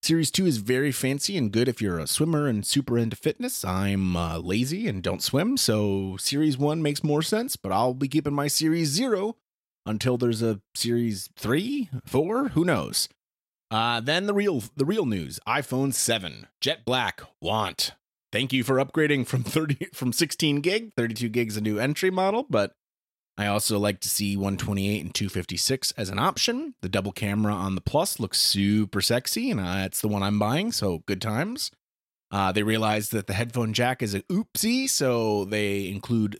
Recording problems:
none

